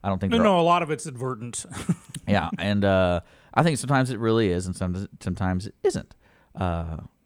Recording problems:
none

